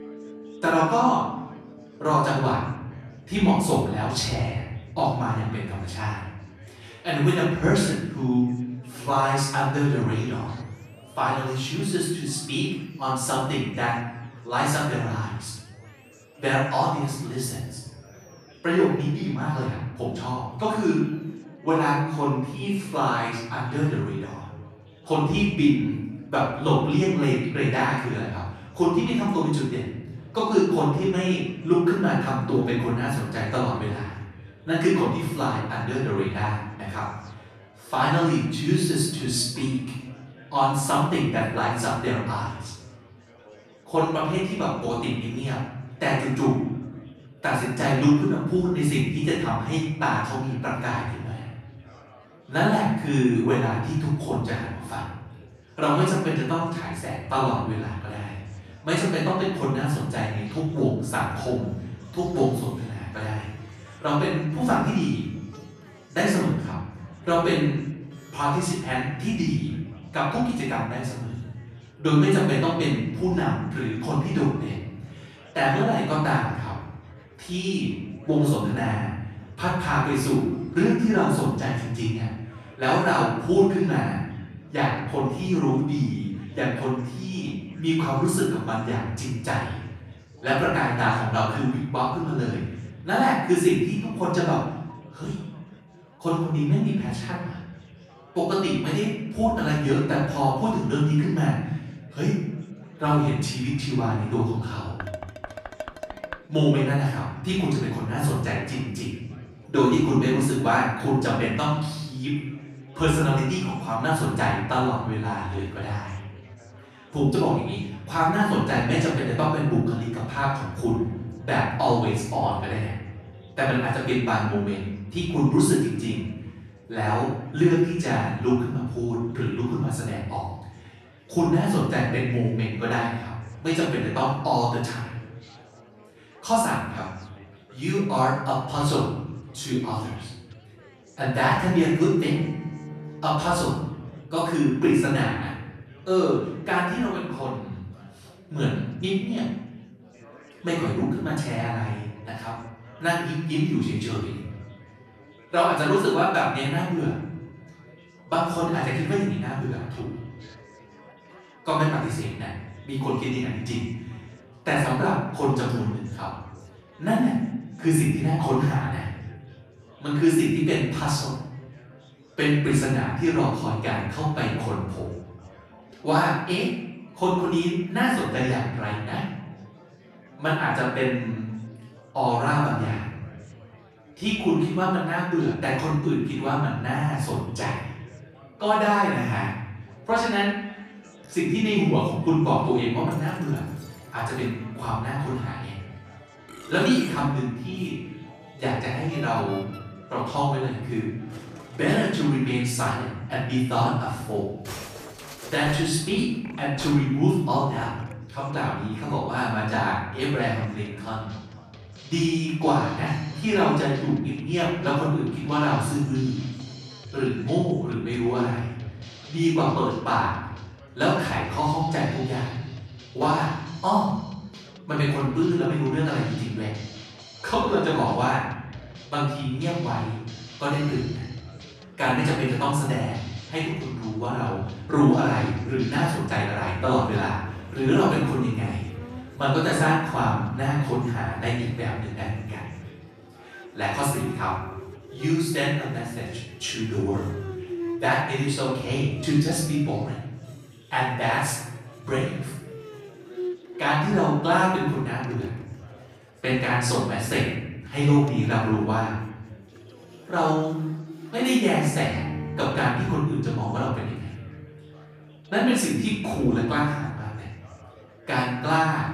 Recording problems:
off-mic speech; far
room echo; noticeable; dies away in 1 s
background music; noticeable; throughout; 20 dB below the speech
chatter from many people; faint; throughout; 25 dB below the speech
clattering dishes; faint; from 1:45 to 1:46; peak 10 dB below the speech

